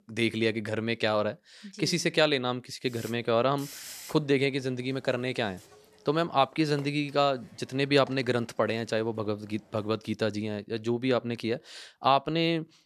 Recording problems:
hiss; faint; from 3 to 10 s; 20 dB below the speech

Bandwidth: 13.5 kHz